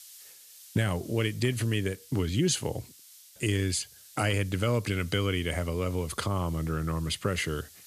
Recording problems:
hiss; faint; throughout; 20 dB below the speech

